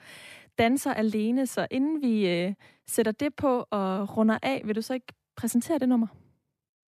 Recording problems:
none

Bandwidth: 14.5 kHz